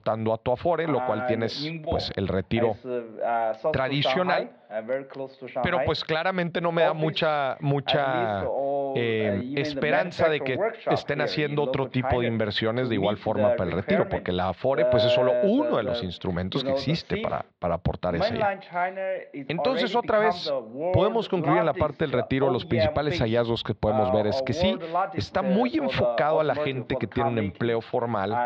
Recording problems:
muffled; slightly; fading above 4 kHz
voice in the background; loud; throughout; 3 dB below the speech

